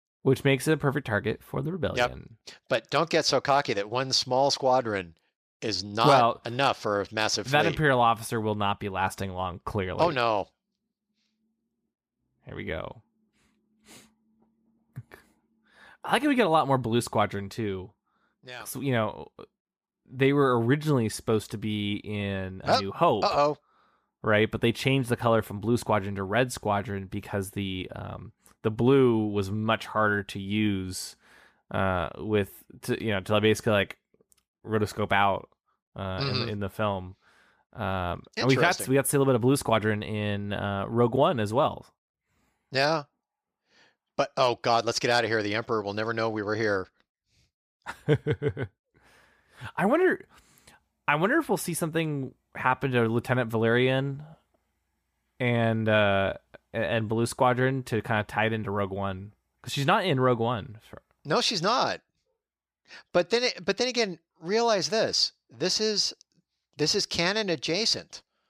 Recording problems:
none

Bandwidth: 15 kHz